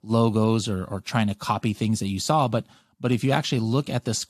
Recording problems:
none

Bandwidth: 14 kHz